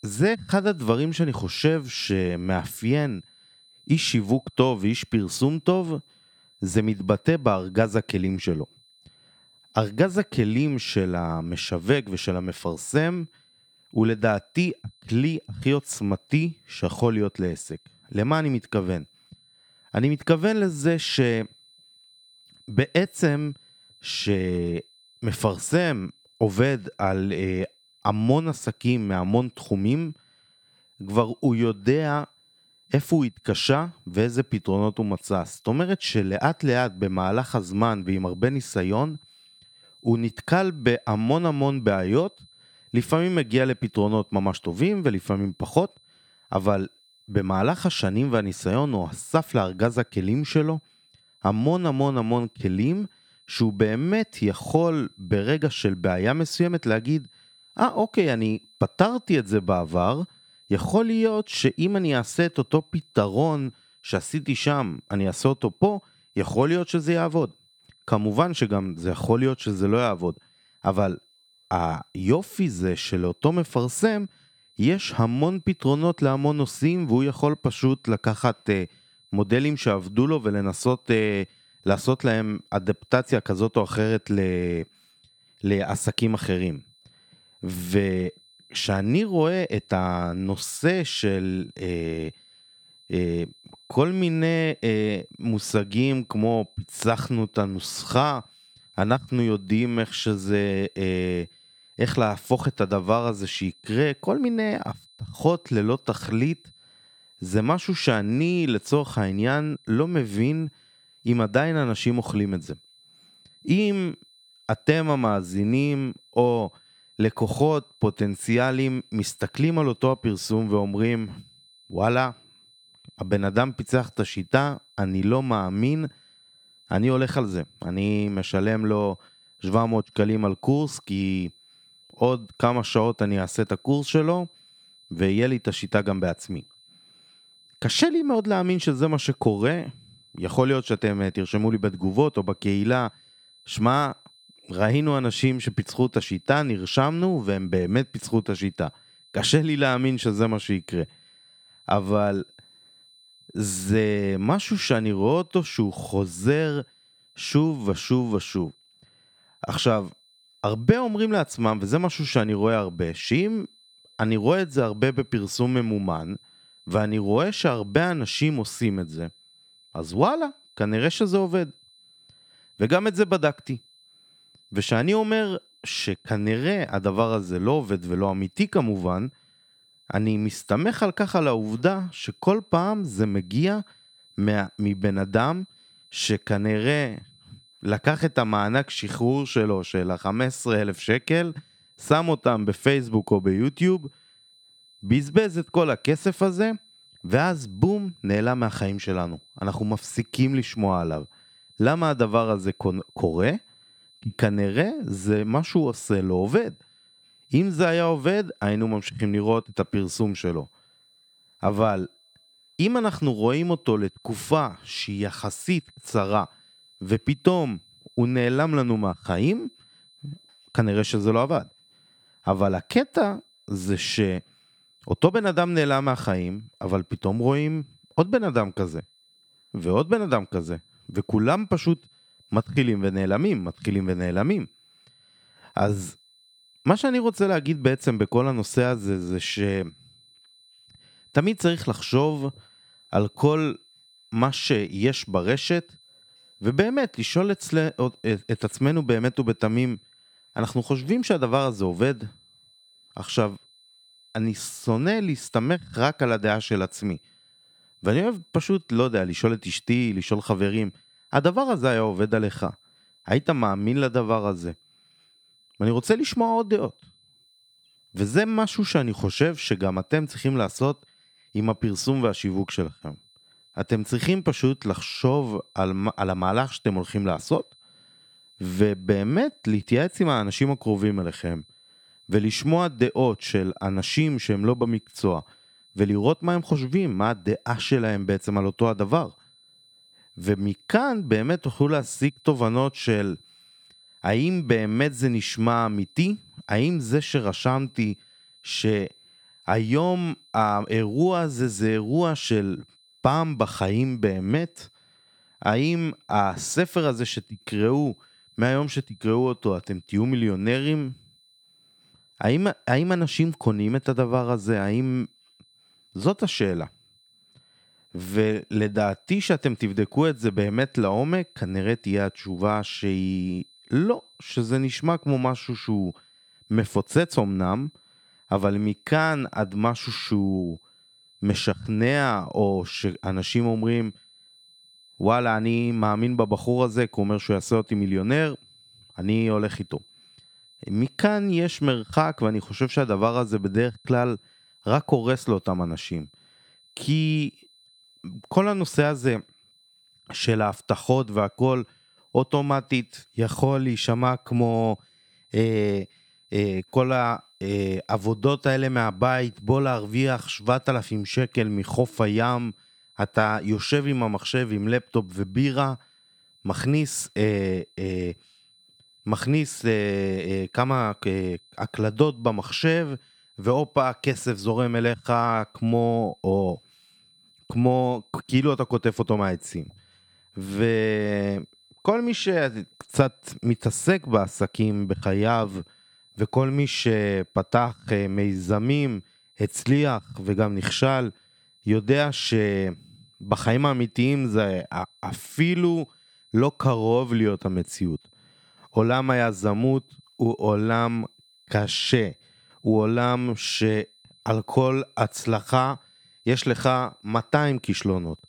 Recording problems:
high-pitched whine; faint; throughout; 4 kHz, 30 dB below the speech

